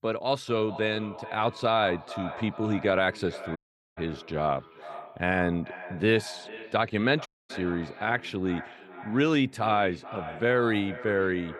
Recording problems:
echo of what is said; noticeable; throughout; 430 ms later, 15 dB below the speech
audio cutting out; at 3.5 s and at 7.5 s

